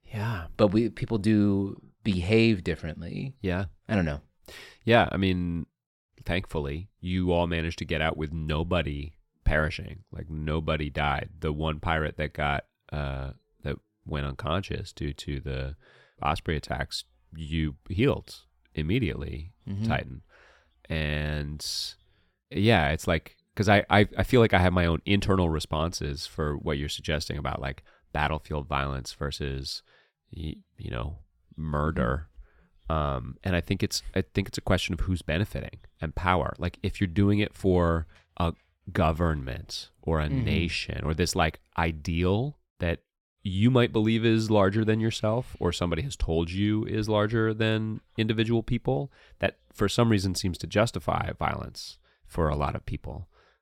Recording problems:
none

